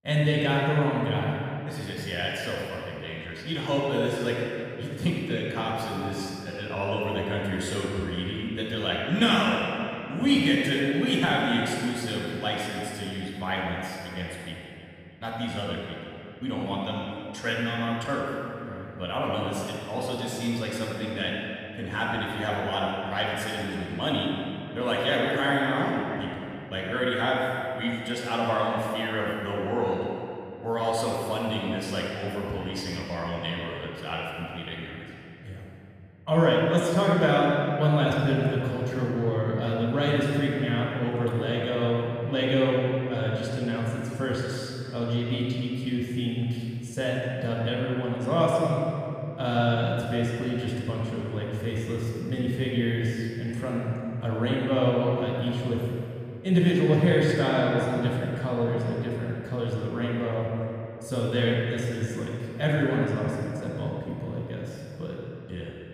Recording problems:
room echo; strong; dies away in 2.9 s
off-mic speech; far
echo of what is said; noticeable; throughout; 310 ms later, 15 dB below the speech

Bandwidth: 14.5 kHz